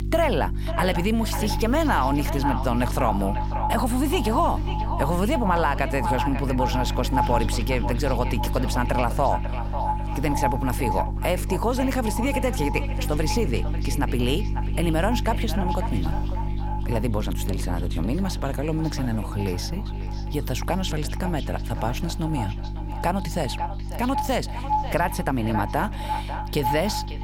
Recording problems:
echo of what is said; strong; throughout; 550 ms later, 6 dB below the speech
electrical hum; noticeable; throughout; 50 Hz, 15 dB below the speech

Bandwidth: 16 kHz